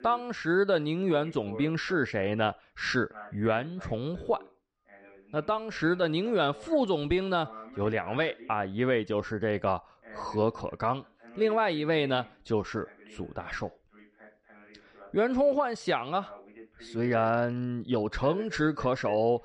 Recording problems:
voice in the background; faint; throughout; 20 dB below the speech

